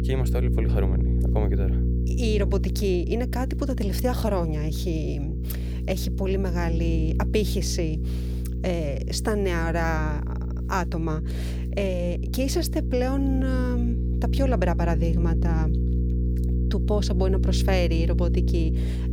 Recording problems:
electrical hum; loud; throughout; 60 Hz, 9 dB below the speech

